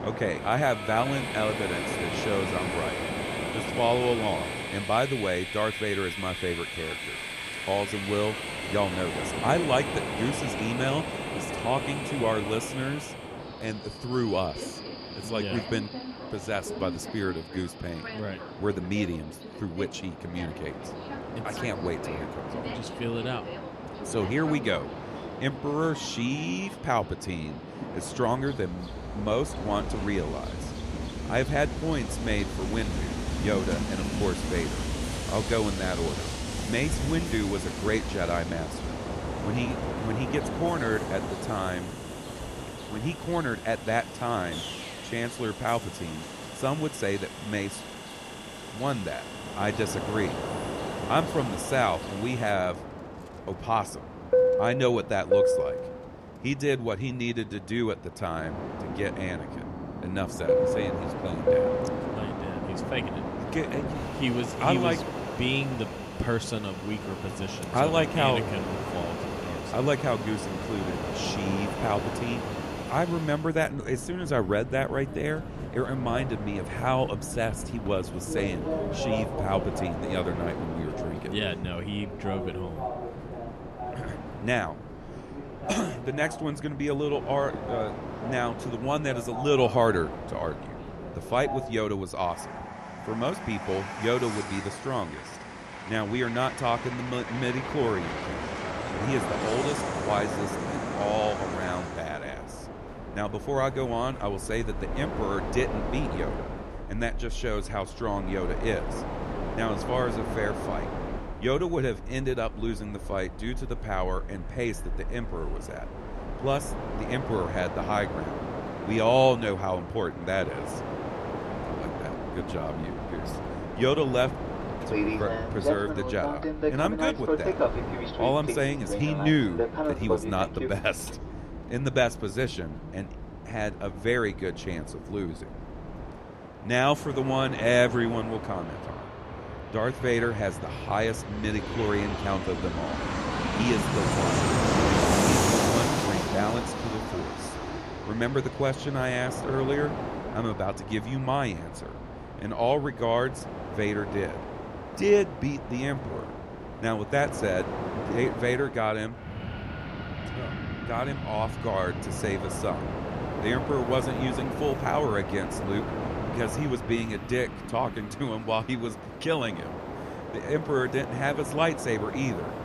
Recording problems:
train or aircraft noise; loud; throughout; 4 dB below the speech

